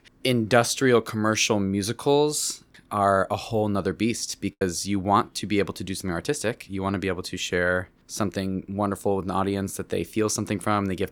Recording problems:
choppy; very; at 4.5 s; 6% of the speech affected

